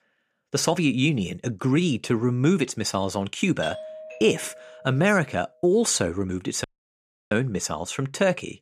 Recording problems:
doorbell; faint; from 3.5 to 5 s; peak 10 dB below the speech
audio cutting out; at 6.5 s for 0.5 s

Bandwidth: 14.5 kHz